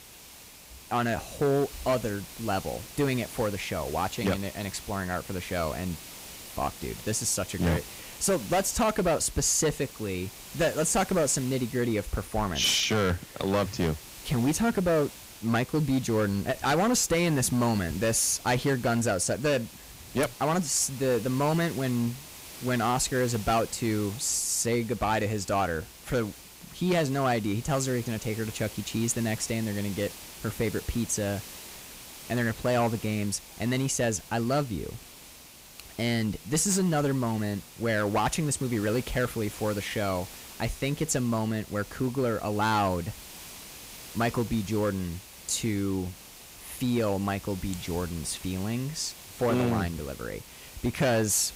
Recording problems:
distortion; slight; 6% of the sound clipped
hiss; noticeable; throughout; 15 dB below the speech

